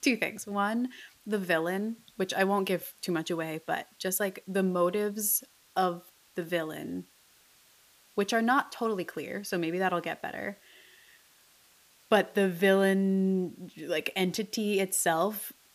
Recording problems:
hiss; faint; throughout; 30 dB below the speech

